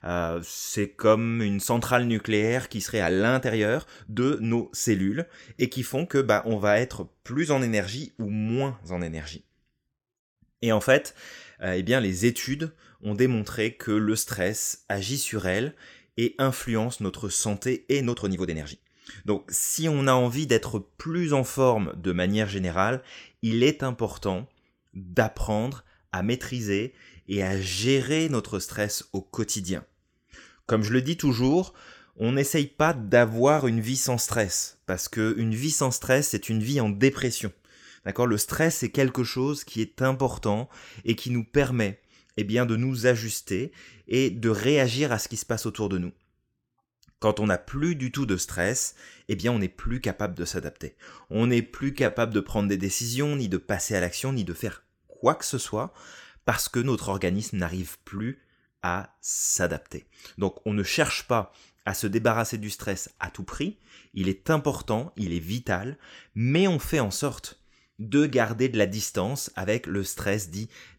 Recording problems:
uneven, jittery; strongly; from 3.5 to 52 s

